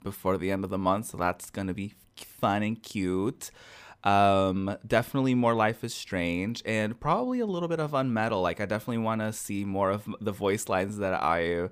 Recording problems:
none

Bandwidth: 15 kHz